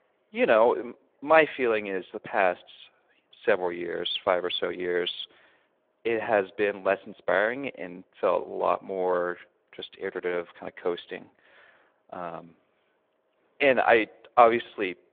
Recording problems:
phone-call audio; nothing above 3.5 kHz

